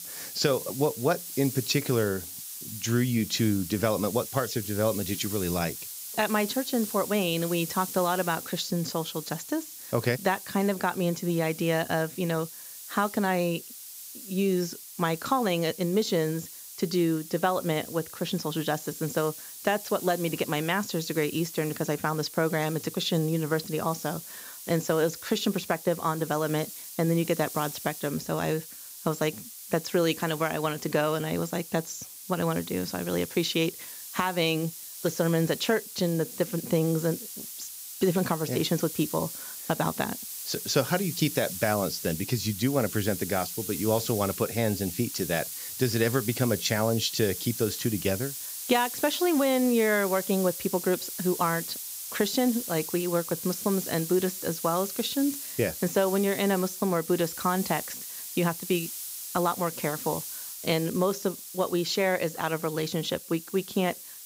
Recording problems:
high frequencies cut off; noticeable; nothing above 8 kHz
hiss; loud; throughout; 8 dB below the speech

